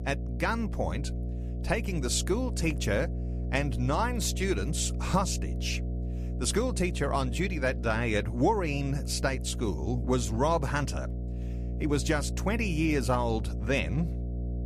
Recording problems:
electrical hum; noticeable; throughout; 60 Hz, 15 dB below the speech

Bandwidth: 14.5 kHz